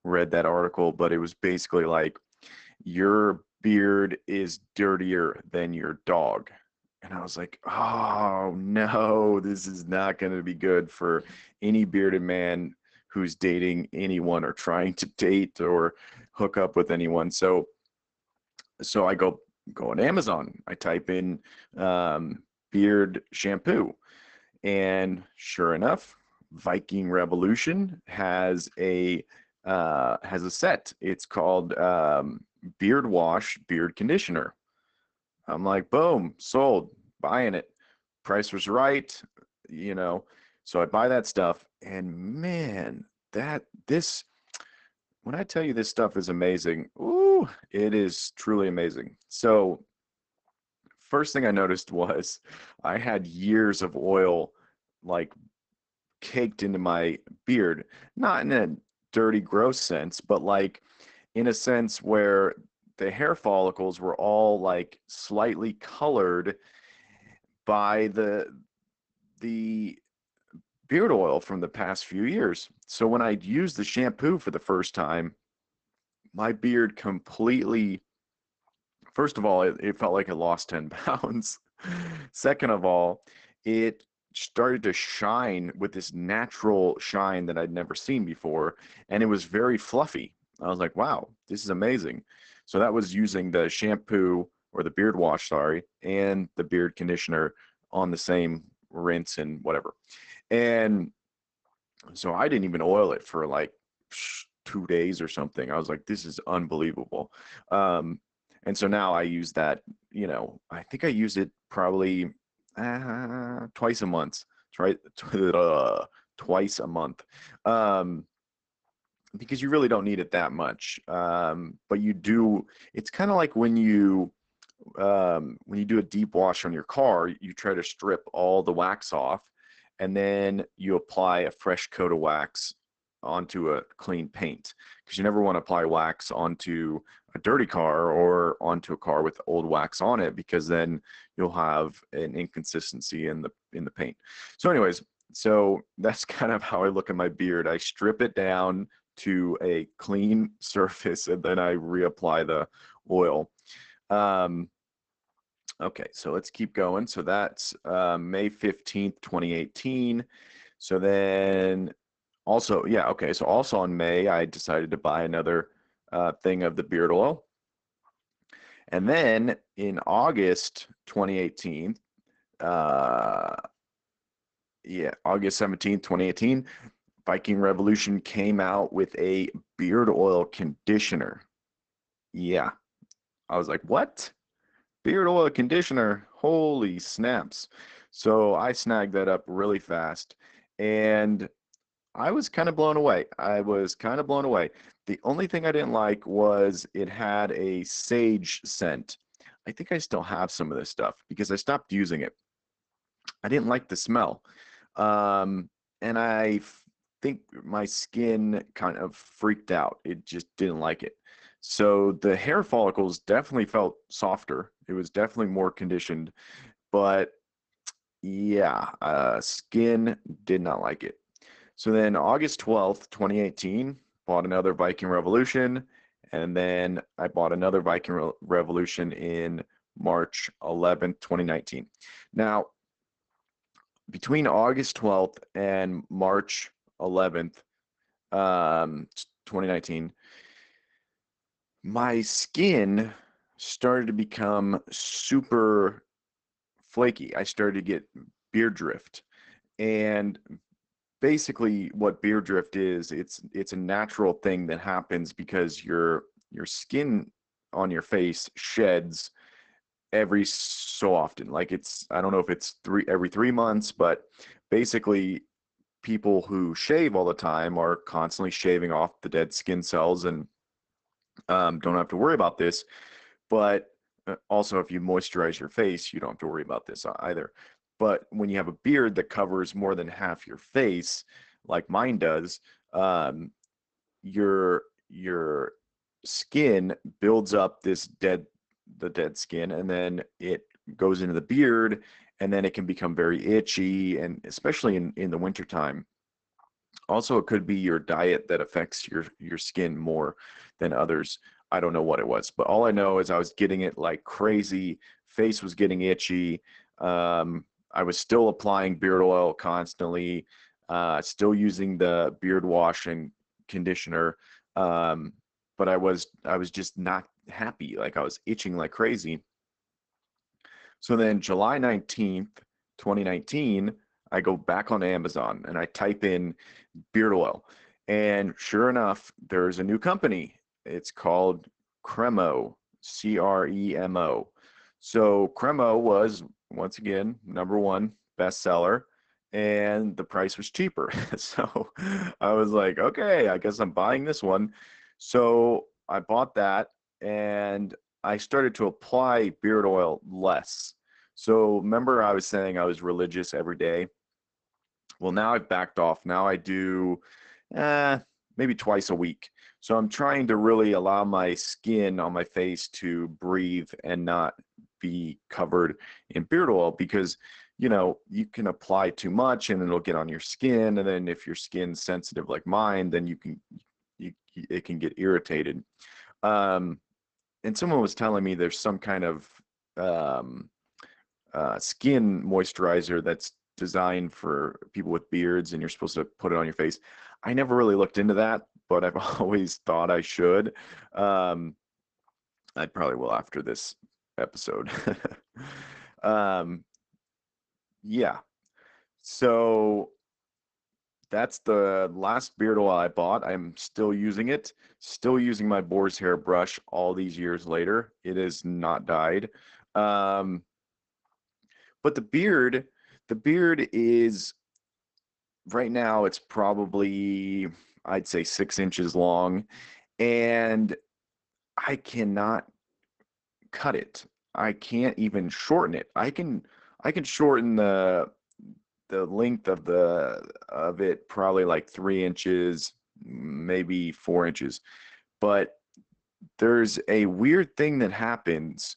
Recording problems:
garbled, watery; badly; nothing above 8 kHz

